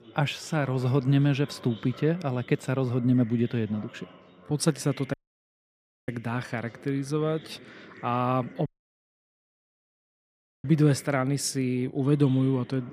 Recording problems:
chatter from many people; faint; throughout; 20 dB below the speech
audio cutting out; at 5 s for 1 s and at 8.5 s for 2 s

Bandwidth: 15 kHz